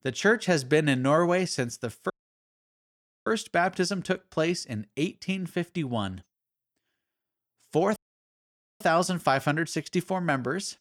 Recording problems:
audio cutting out; at 2 s for 1 s and at 8 s for 1 s

